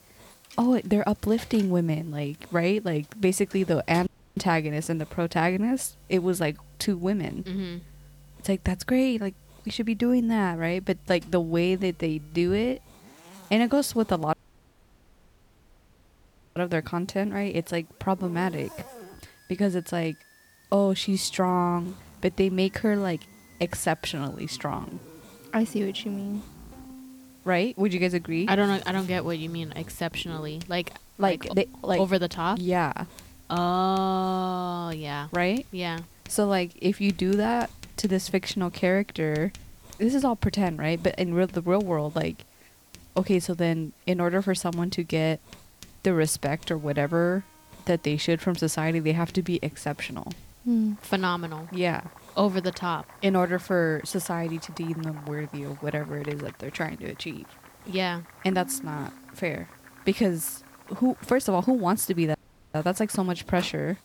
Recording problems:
household noises; faint; throughout; 20 dB below the speech
background music; faint; throughout; 30 dB below the speech
hiss; faint; throughout; 30 dB below the speech
audio cutting out; at 4 s, at 14 s for 2 s and at 1:02

